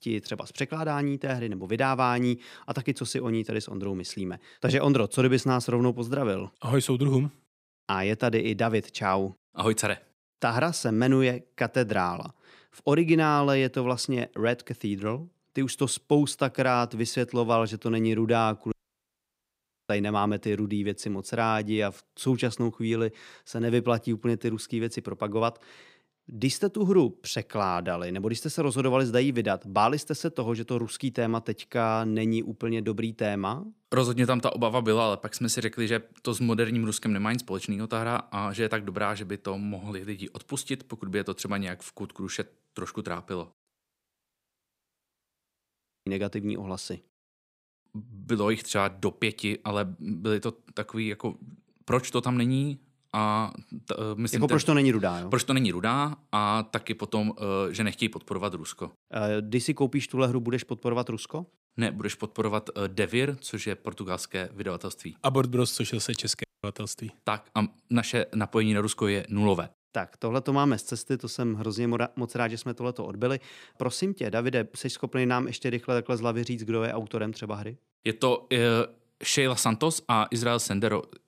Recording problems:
audio cutting out; at 19 s for 1 s, at 44 s for 2.5 s and at 1:06

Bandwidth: 15.5 kHz